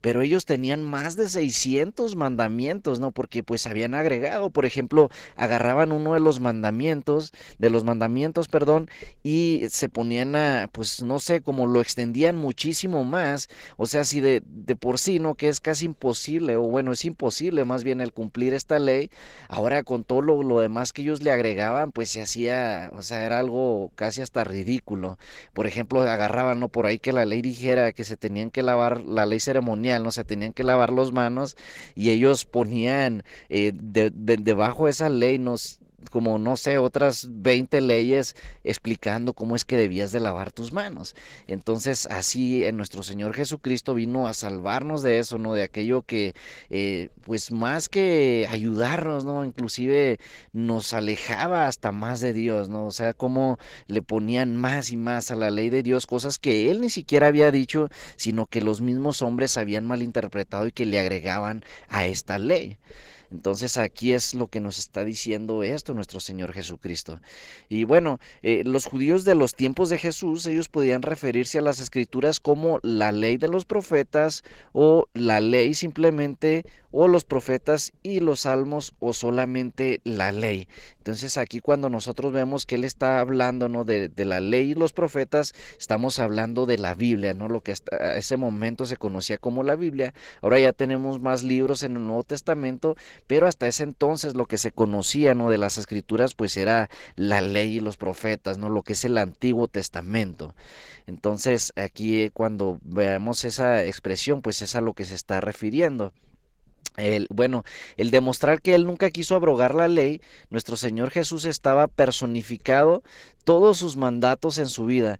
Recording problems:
garbled, watery; slightly; nothing above 16.5 kHz

